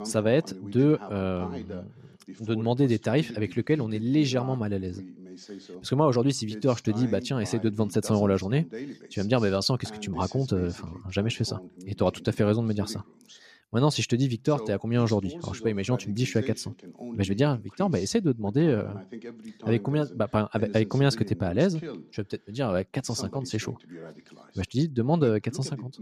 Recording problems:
voice in the background; noticeable; throughout; 15 dB below the speech

